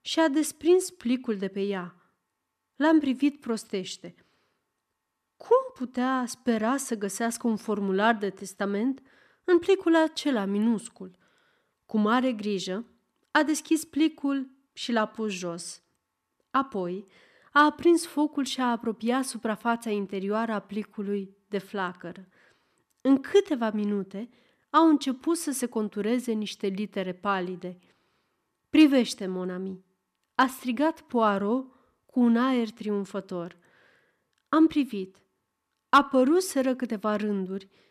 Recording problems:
none

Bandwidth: 14.5 kHz